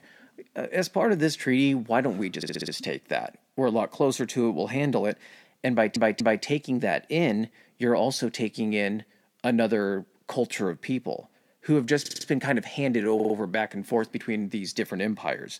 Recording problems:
audio stuttering; 4 times, first at 2.5 s

